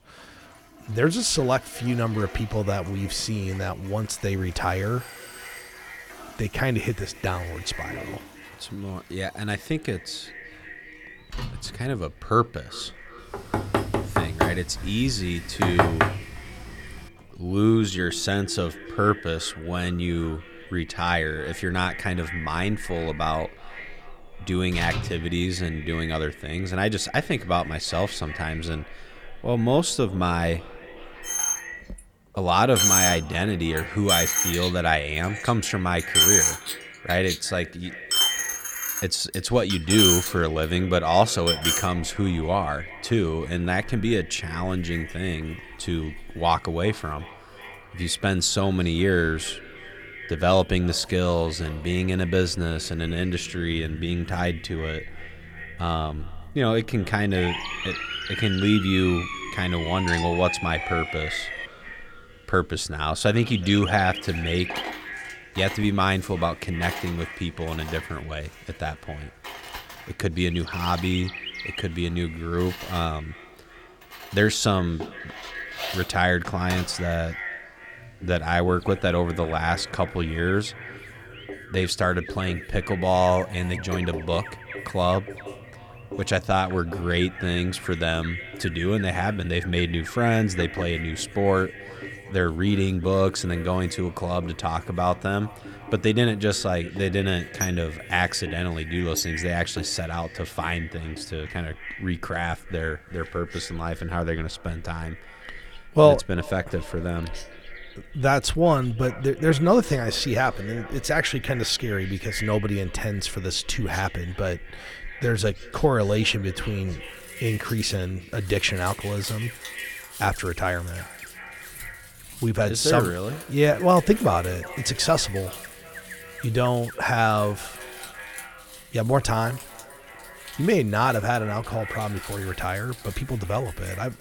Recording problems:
echo of what is said; noticeable; throughout; 370 ms later, 15 dB below the speech
household noises; loud; throughout; 4 dB below the speech
animal sounds; noticeable; throughout; 15 dB below the speech
doorbell; faint; at 5 s; peak 15 dB below the speech
door banging; loud; from 13 to 16 s; peak 4 dB above the speech
siren; noticeable; from 57 s to 1:02; peak 4 dB below the speech

